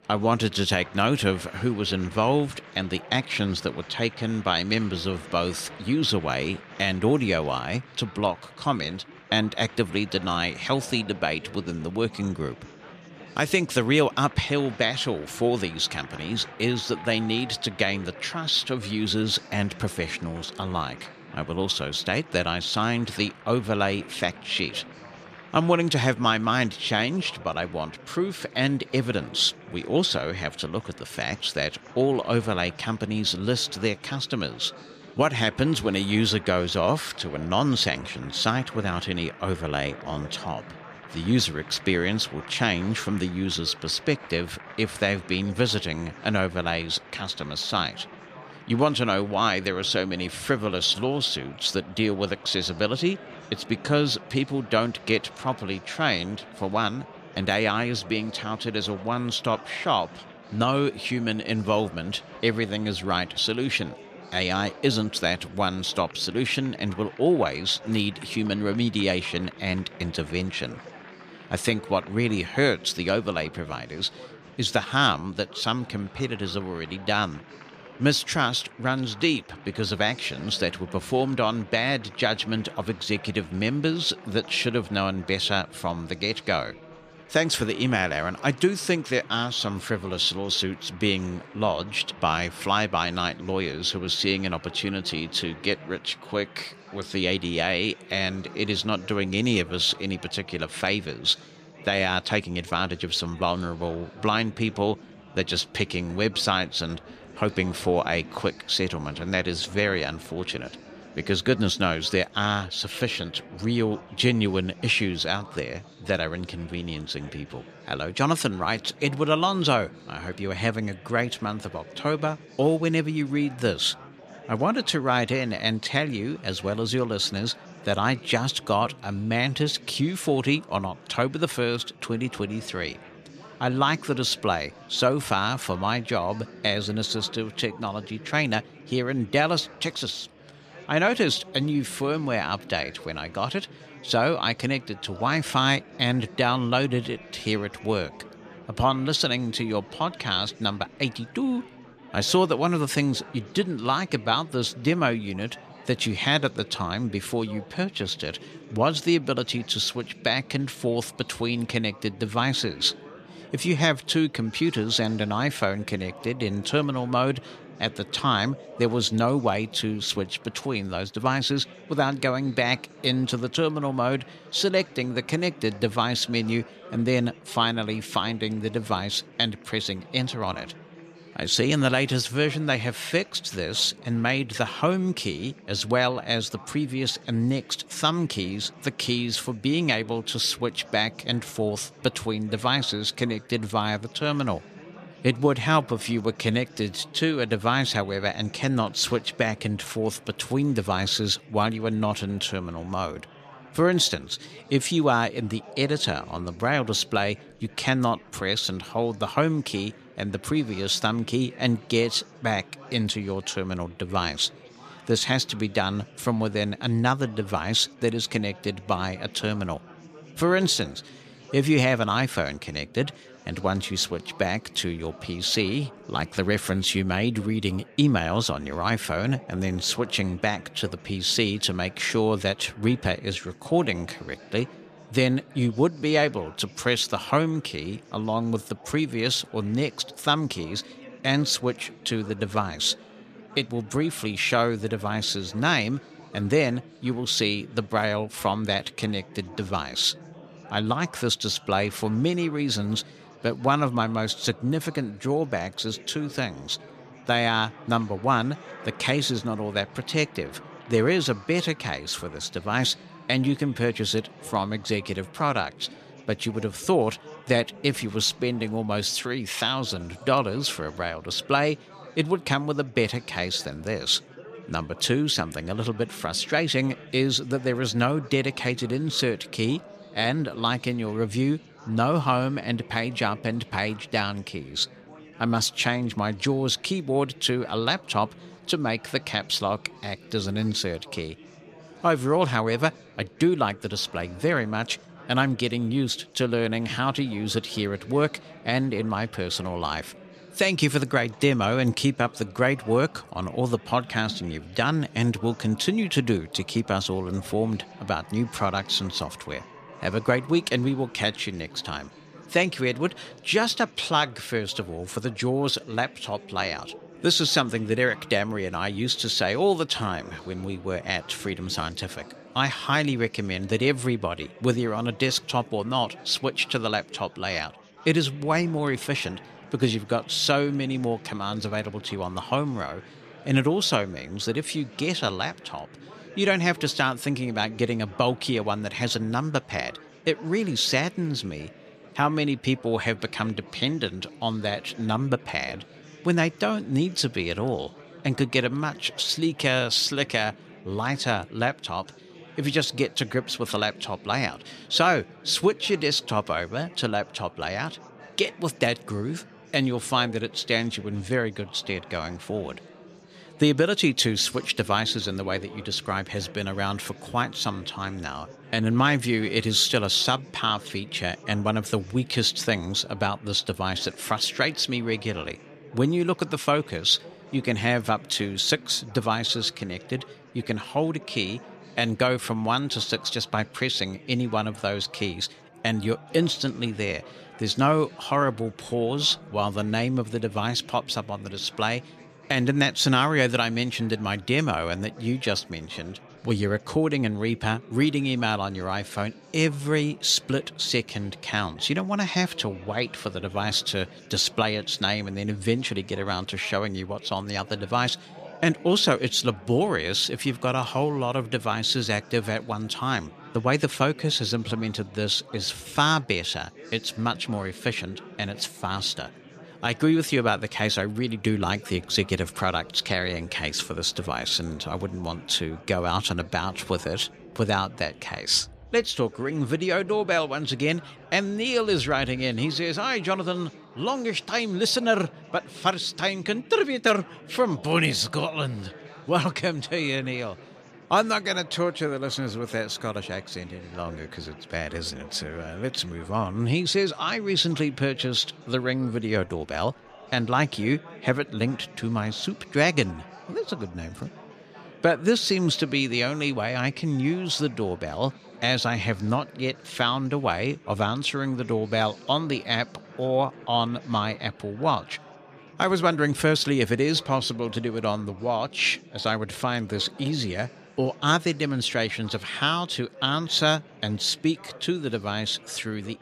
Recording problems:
chatter from many people; faint; throughout; 20 dB below the speech

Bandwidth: 14.5 kHz